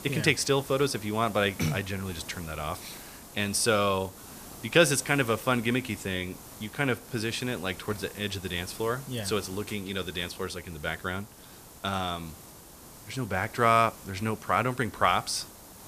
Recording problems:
hiss; noticeable; throughout; 15 dB below the speech

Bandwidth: 14.5 kHz